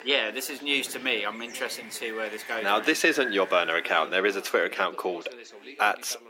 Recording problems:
thin; somewhat; fading below 300 Hz
wind noise on the microphone; occasional gusts; until 4 s; 15 dB below the speech
animal sounds; faint; throughout; 25 dB below the speech
background chatter; faint; throughout; 4 voices, 20 dB below the speech

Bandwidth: 16 kHz